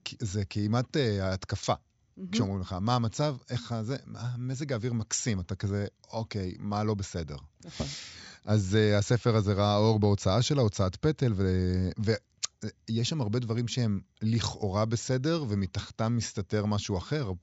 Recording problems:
high frequencies cut off; noticeable; nothing above 8 kHz

